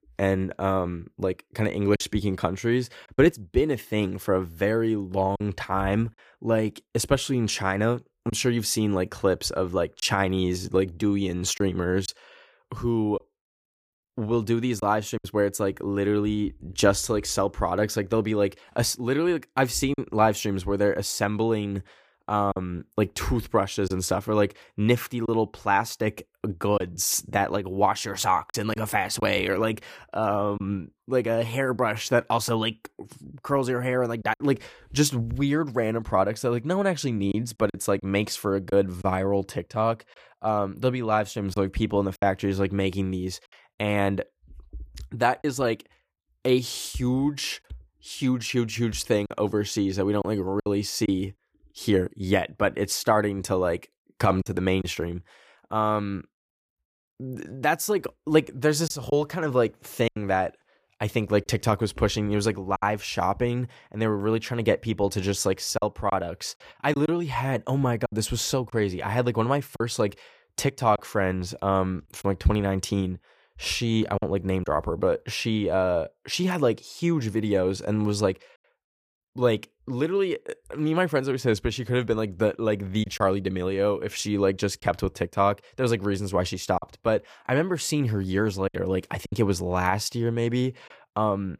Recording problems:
choppy; occasionally; 2% of the speech affected

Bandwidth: 15 kHz